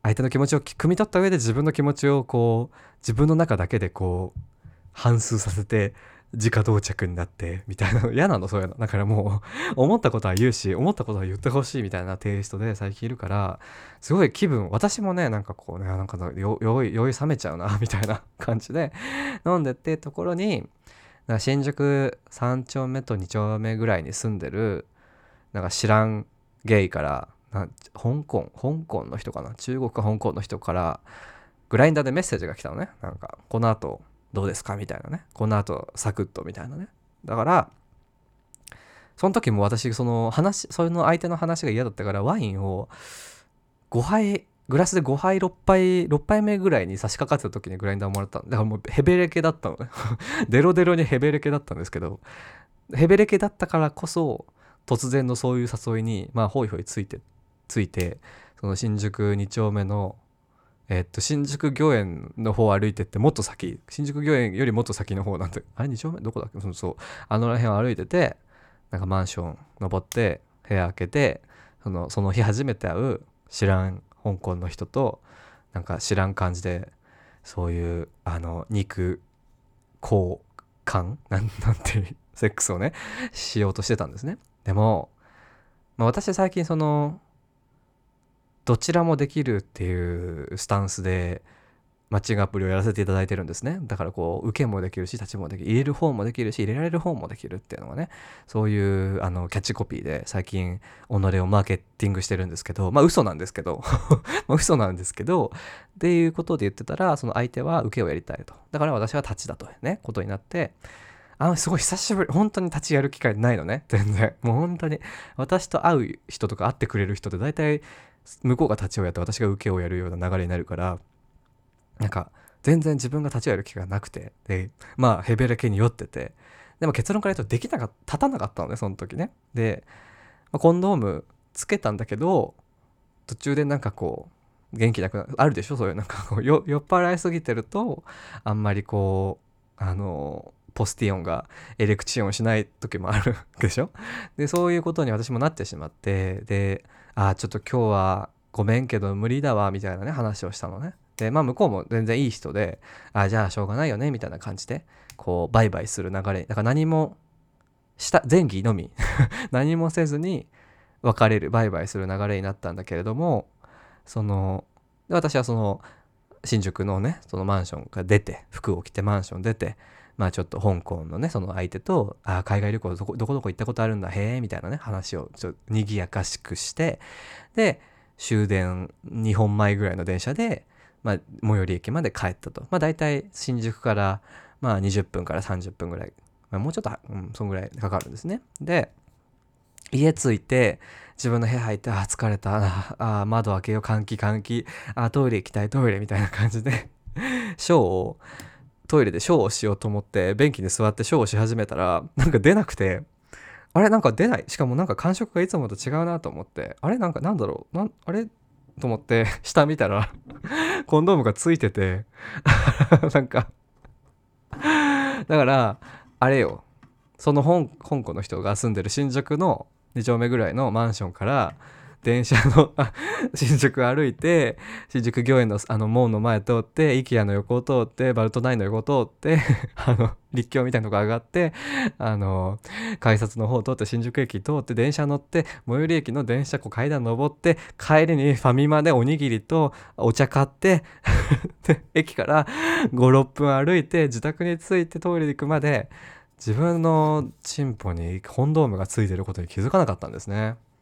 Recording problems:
none

